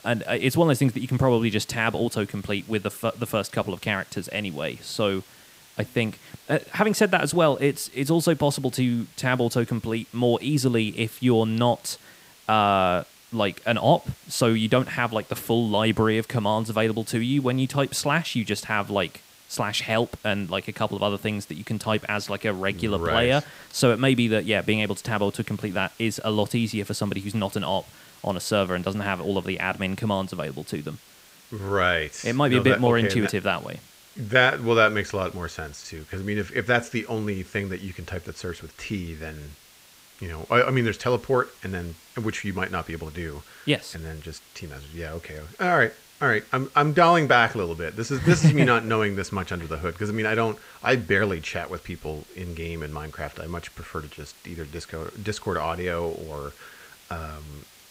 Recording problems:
hiss; faint; throughout; 25 dB below the speech

